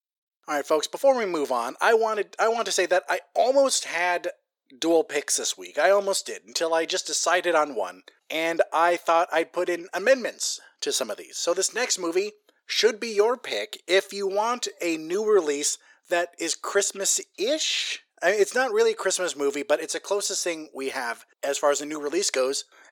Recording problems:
thin; very; fading below 400 Hz

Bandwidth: 18 kHz